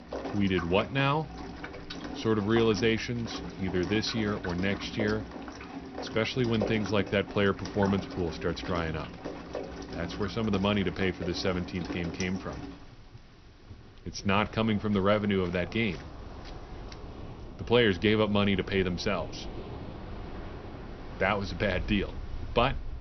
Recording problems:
high frequencies cut off; noticeable; nothing above 6 kHz
rain or running water; noticeable; throughout; 10 dB below the speech

